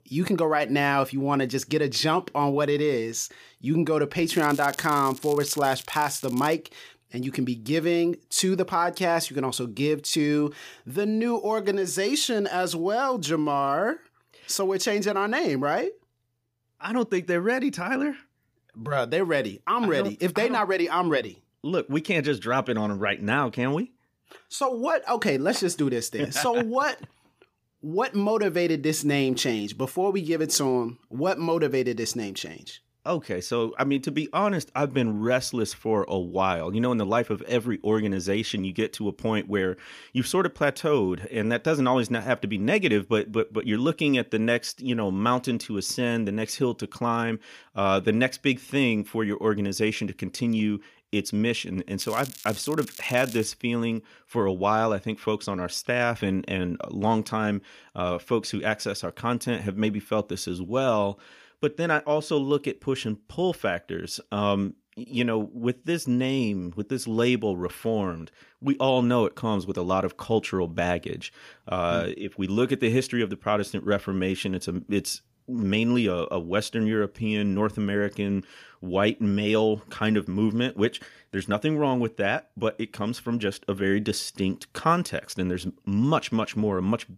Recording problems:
crackling; noticeable; from 4.5 to 6.5 s and from 52 to 53 s; 15 dB below the speech

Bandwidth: 15 kHz